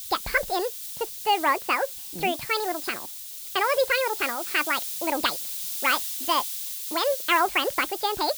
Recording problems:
wrong speed and pitch; too fast and too high; 1.7 times normal speed
high frequencies cut off; noticeable; nothing above 5.5 kHz
hiss; loud; throughout; 6 dB below the speech

